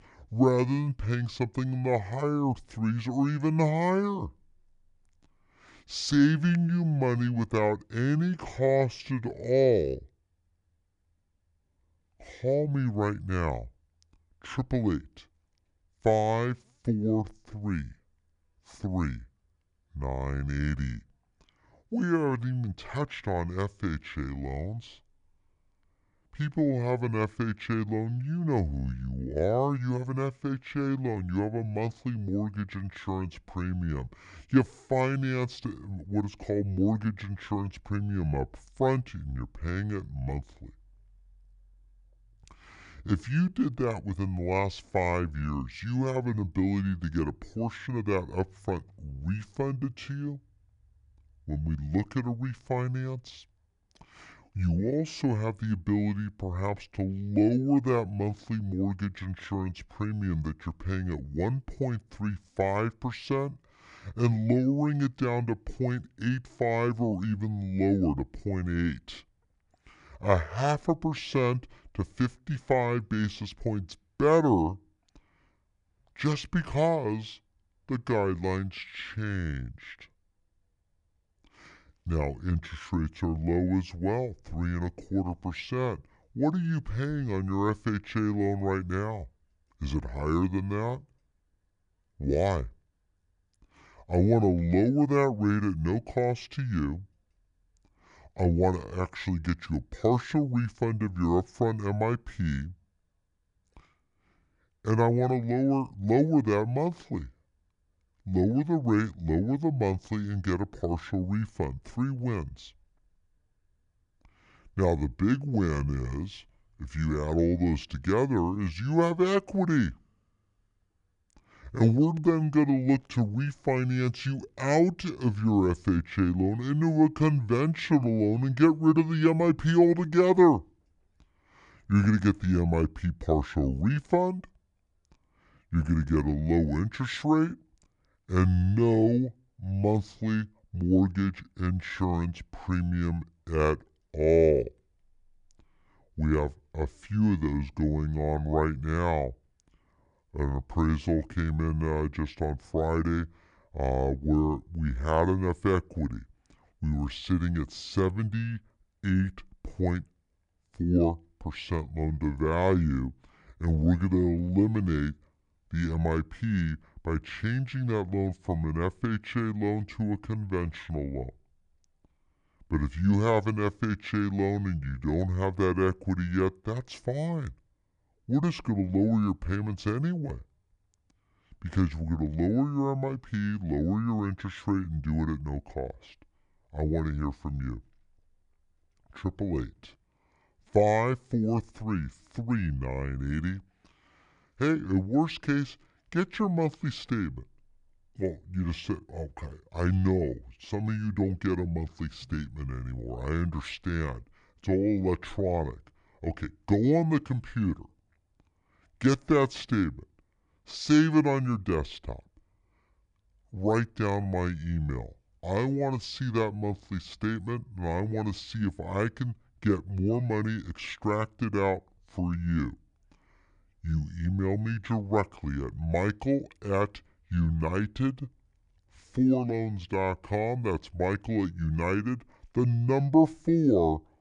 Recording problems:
wrong speed and pitch; too slow and too low; 0.7 times normal speed

